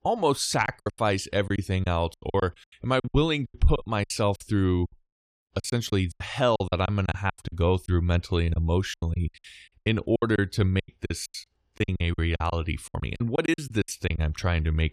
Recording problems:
choppy; very; 17% of the speech affected

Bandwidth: 14.5 kHz